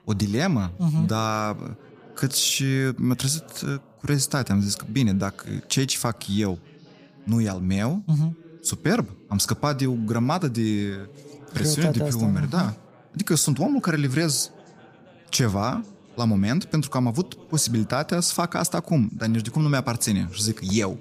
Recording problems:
background chatter; faint; throughout; 3 voices, 25 dB below the speech

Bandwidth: 15 kHz